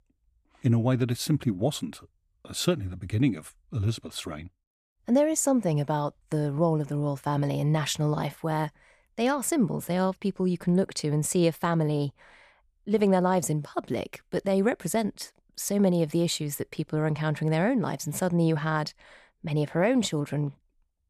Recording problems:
none

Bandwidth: 14.5 kHz